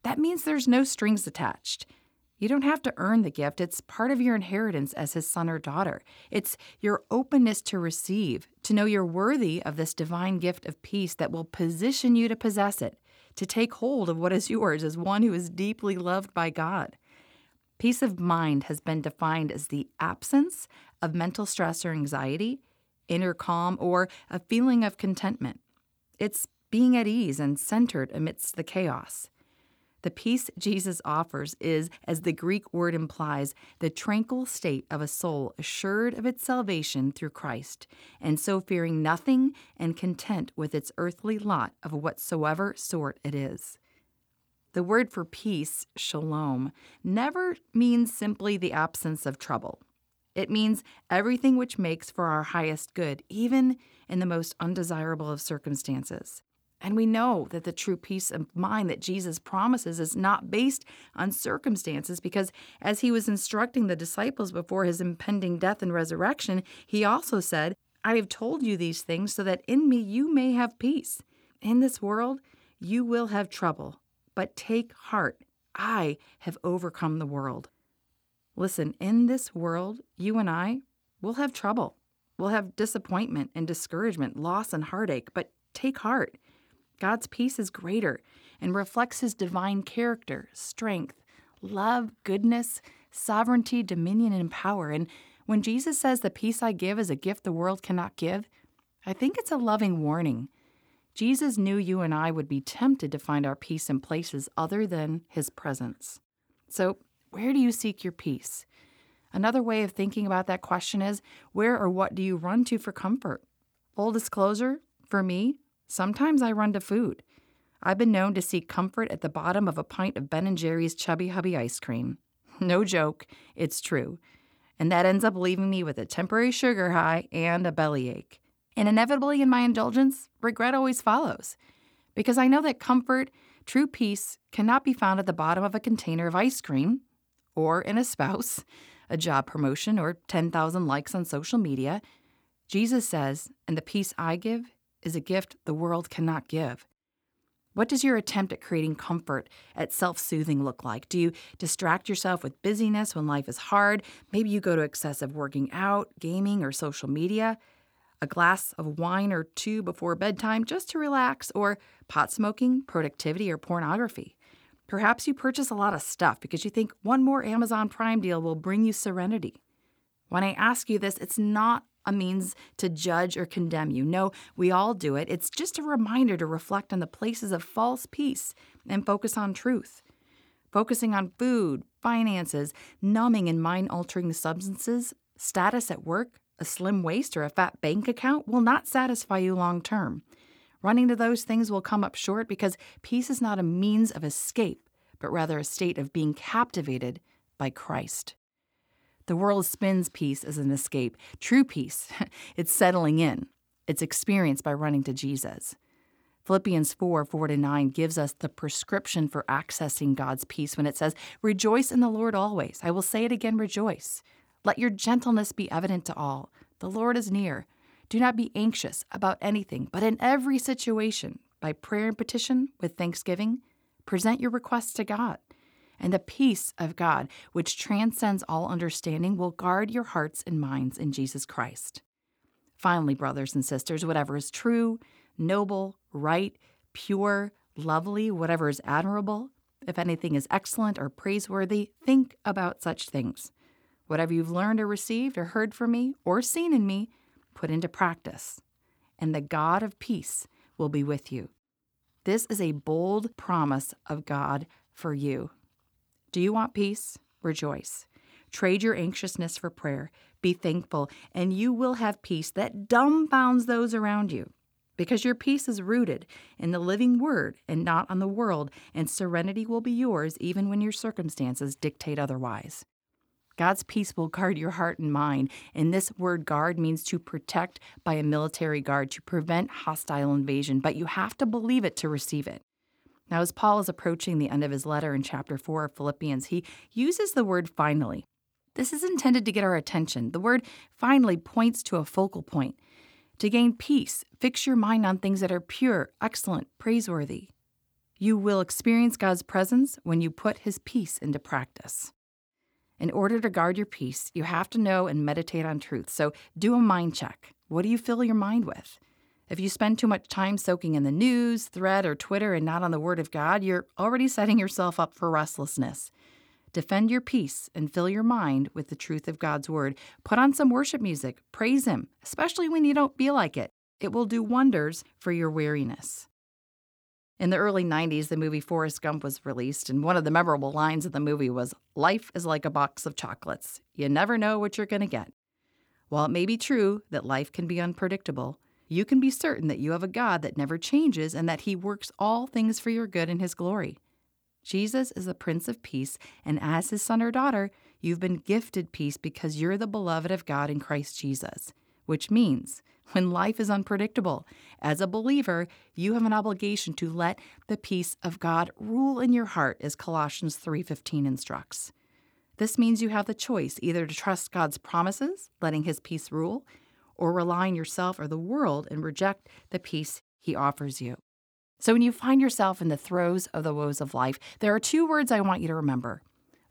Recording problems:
none

